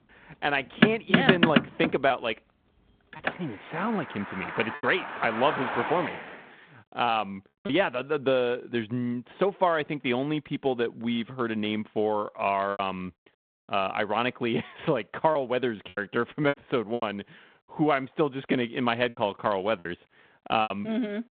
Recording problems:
phone-call audio
traffic noise; very loud; until 6.5 s; as loud as the speech
choppy; occasionally; 4% of the speech affected

